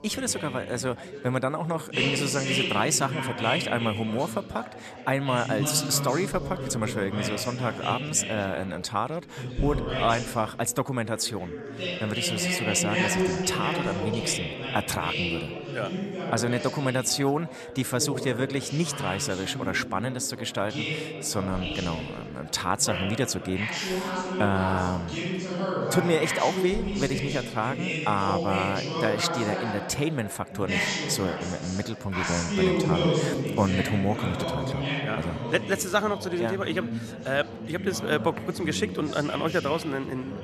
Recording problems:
chatter from many people; loud; throughout; 2 dB below the speech

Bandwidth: 13.5 kHz